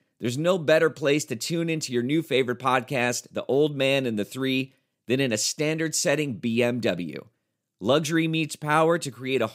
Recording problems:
none

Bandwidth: 15.5 kHz